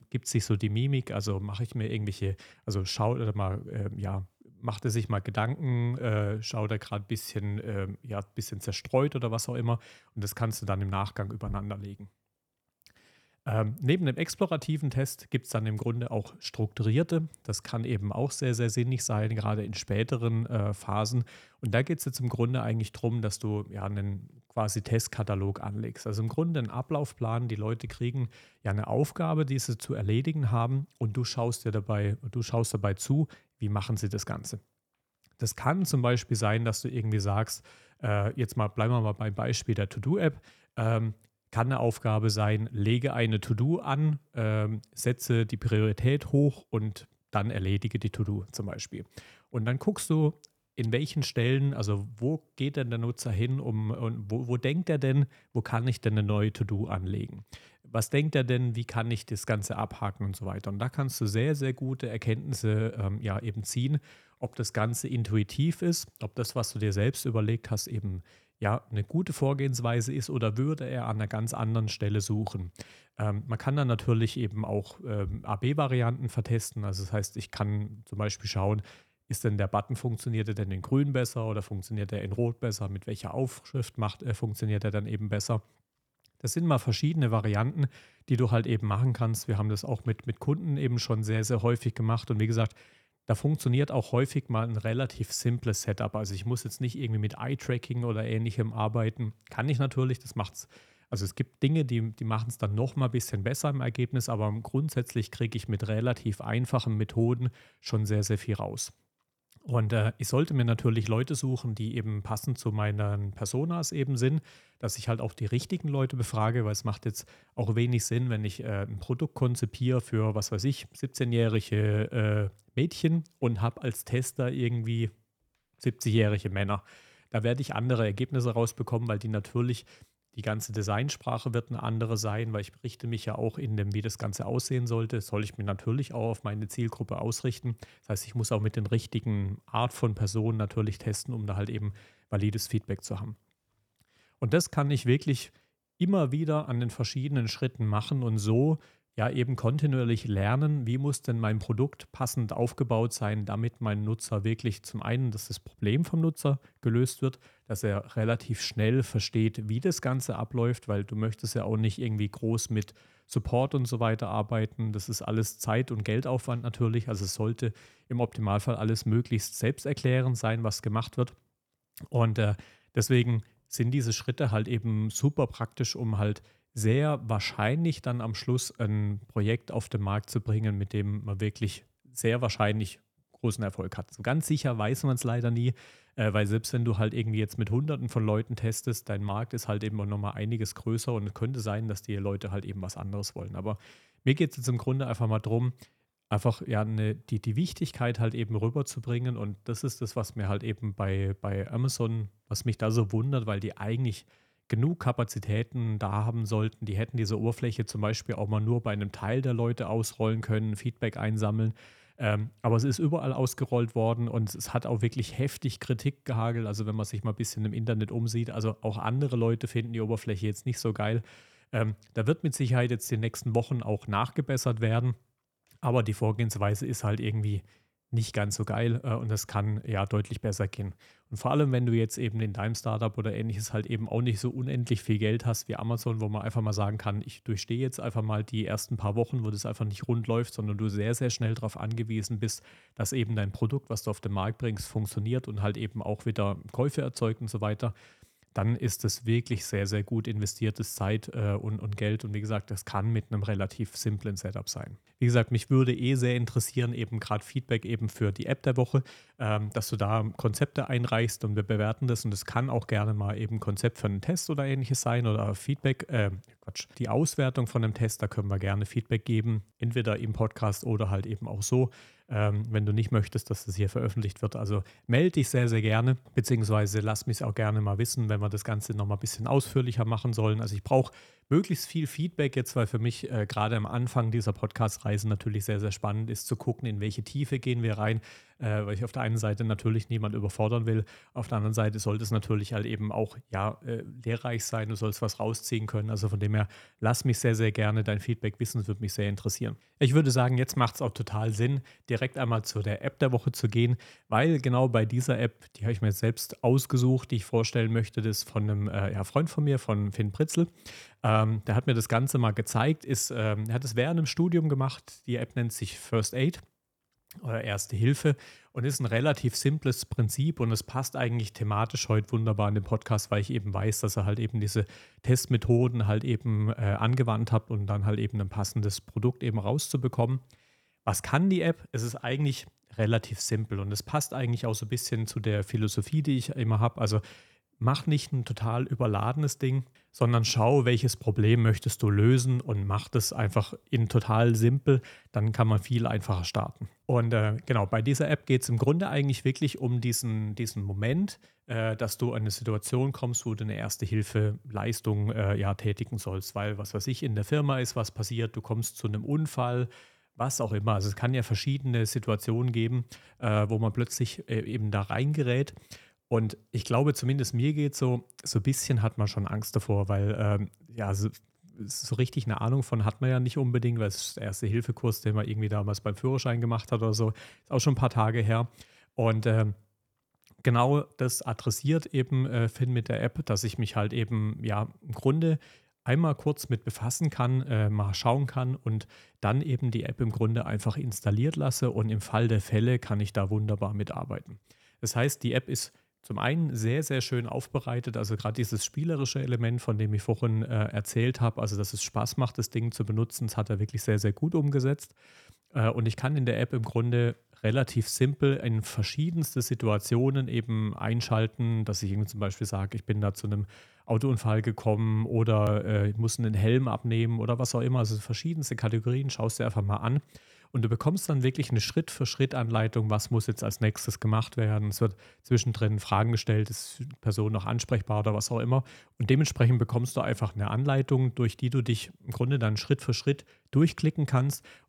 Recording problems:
none

